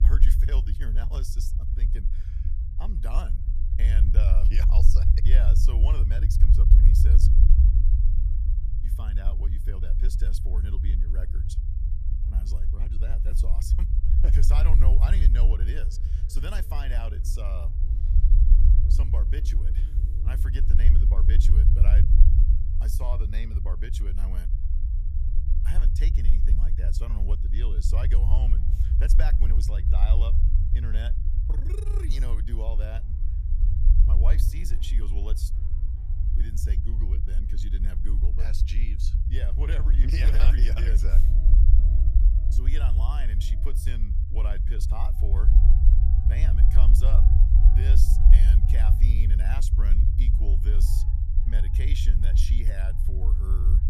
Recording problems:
low rumble; loud; throughout; 2 dB below the speech
background music; noticeable; throughout; 20 dB below the speech

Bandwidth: 14.5 kHz